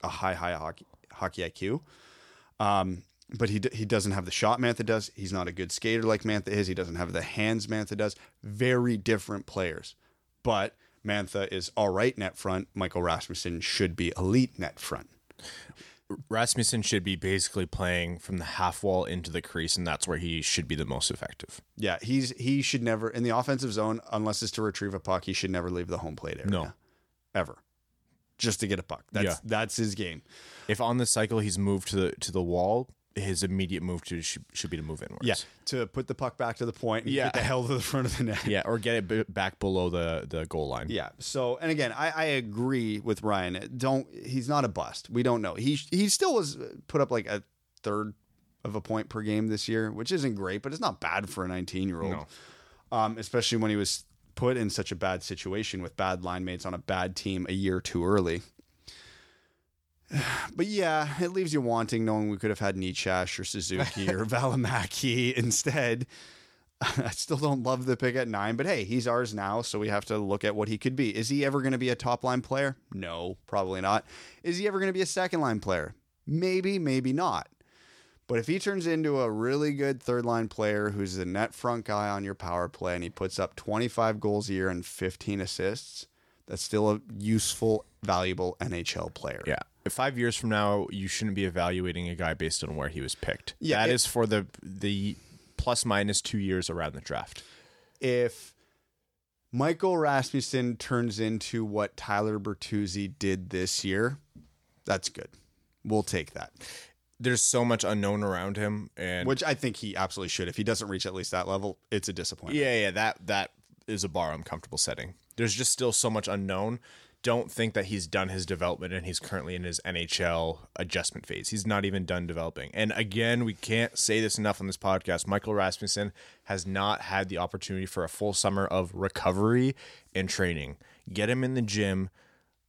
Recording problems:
none

